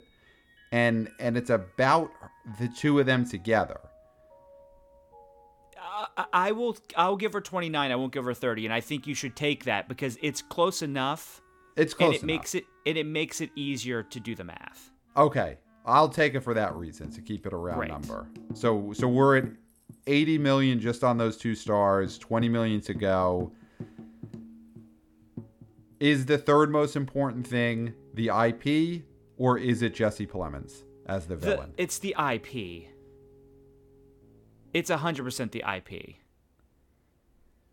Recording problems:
background music; faint; throughout; 20 dB below the speech

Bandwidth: 17.5 kHz